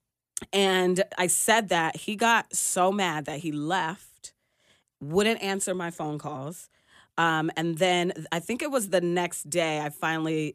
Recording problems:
none

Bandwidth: 14.5 kHz